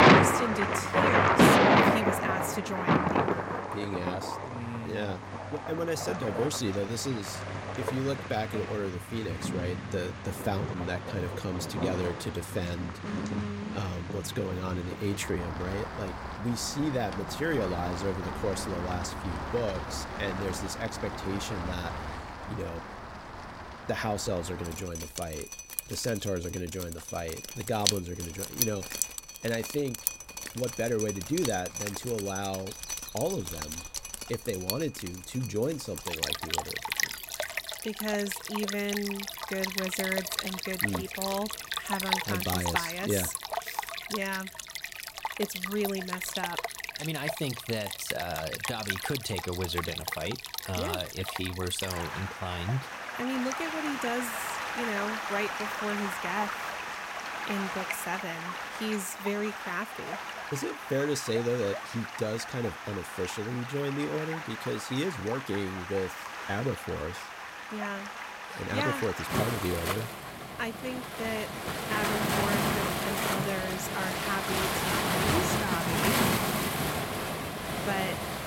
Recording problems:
rain or running water; very loud; throughout; 2 dB above the speech

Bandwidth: 16 kHz